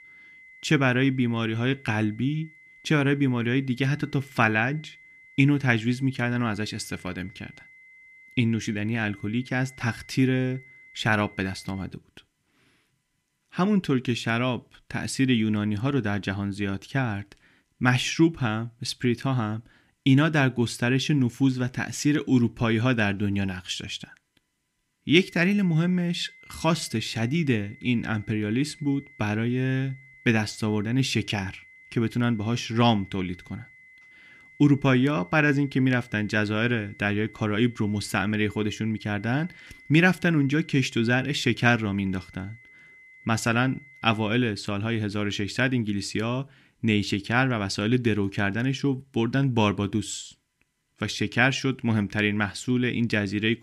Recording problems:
high-pitched whine; faint; until 12 s and from 25 to 44 s; 2 kHz, 25 dB below the speech

